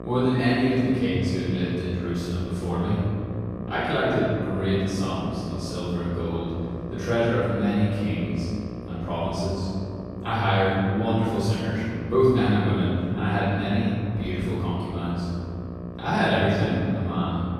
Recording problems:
room echo; strong; dies away in 2.6 s
off-mic speech; far
electrical hum; noticeable; throughout; 60 Hz, 15 dB below the speech

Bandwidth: 14.5 kHz